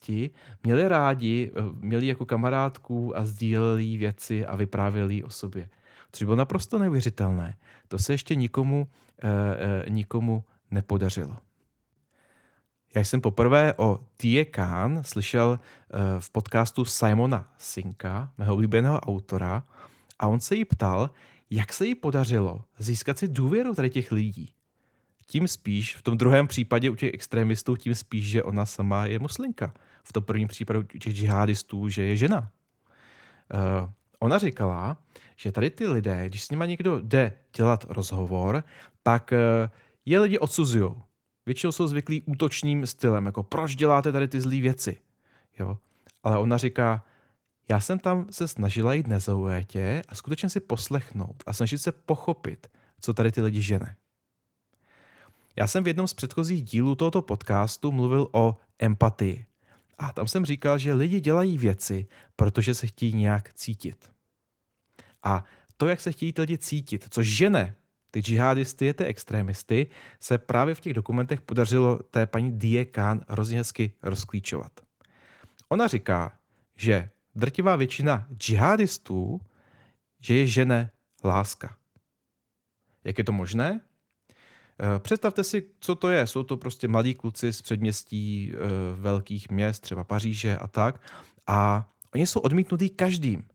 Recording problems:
garbled, watery; slightly; nothing above 18 kHz

